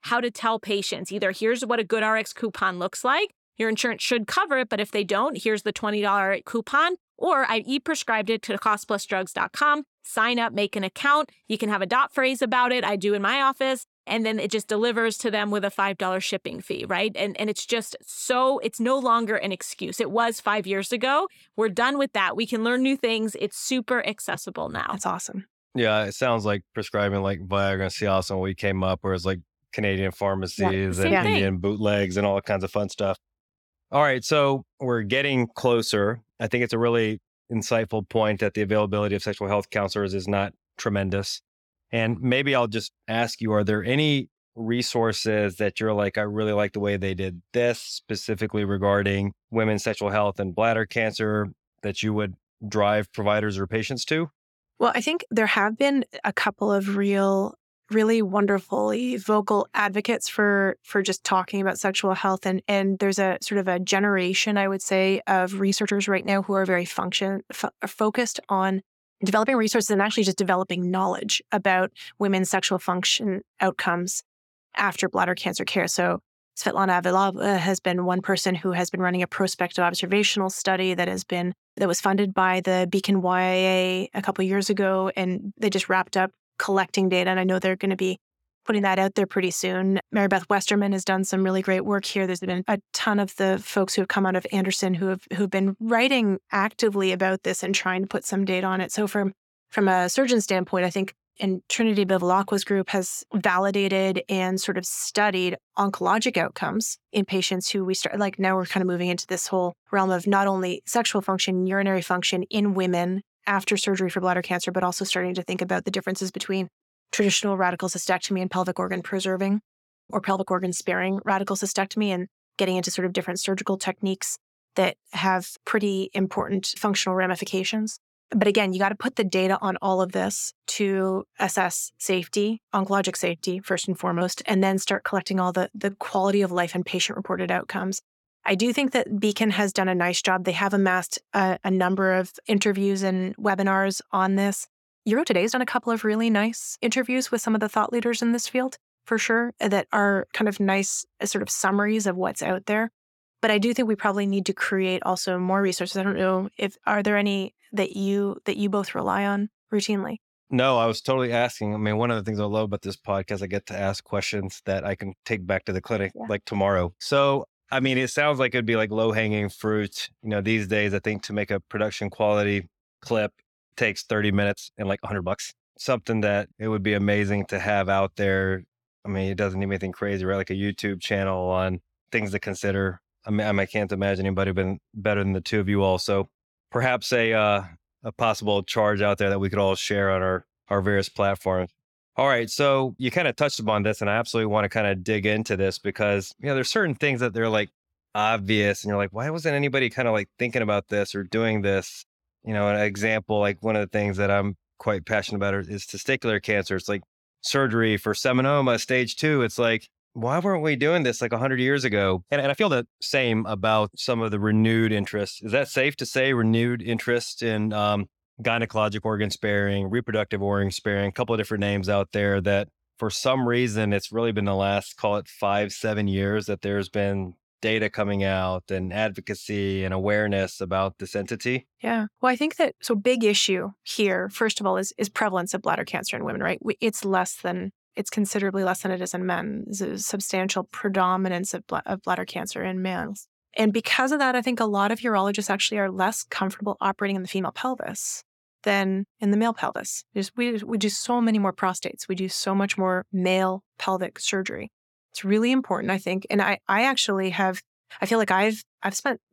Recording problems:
uneven, jittery; strongly; from 7 s to 4:11

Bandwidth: 17.5 kHz